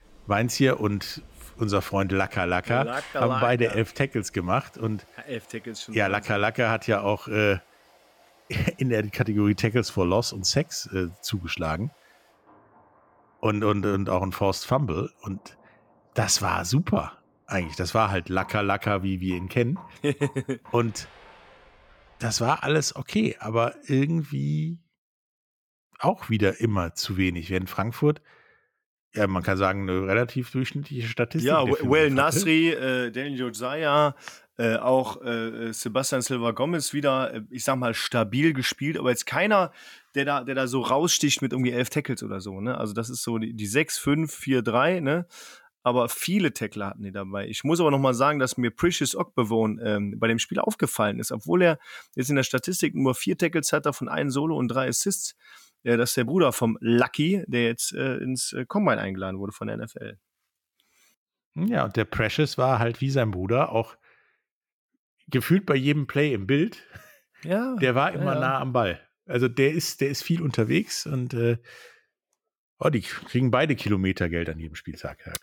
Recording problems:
rain or running water; faint; until 22 s; 25 dB below the speech

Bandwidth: 17 kHz